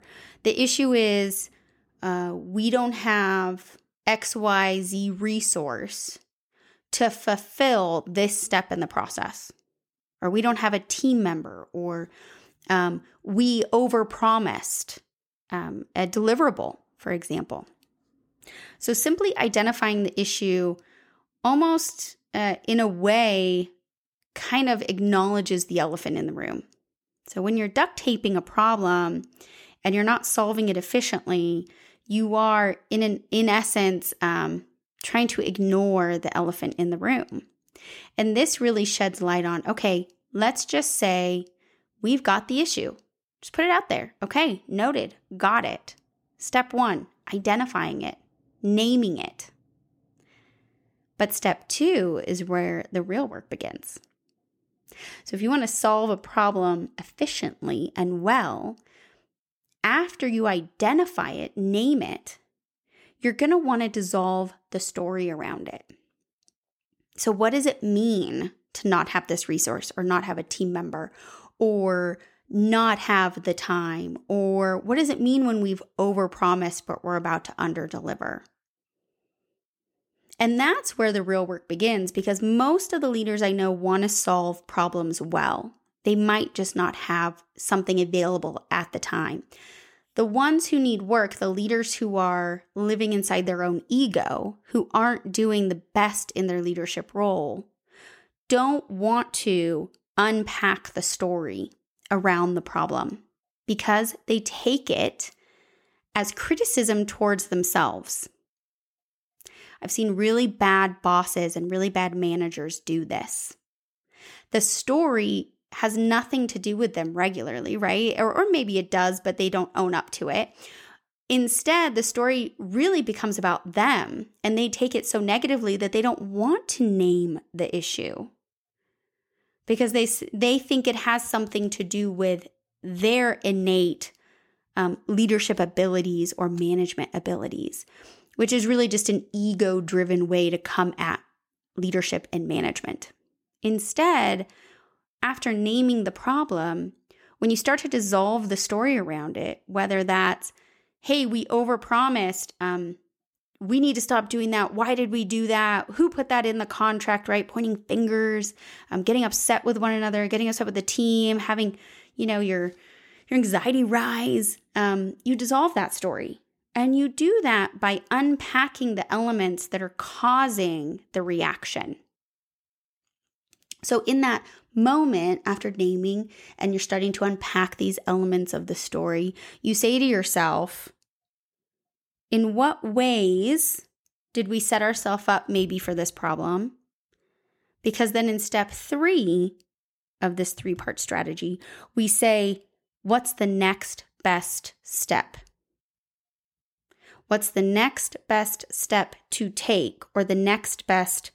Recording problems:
none

